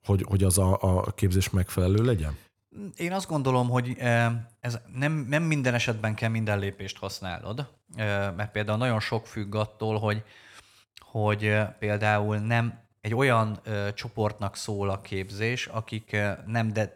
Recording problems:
none

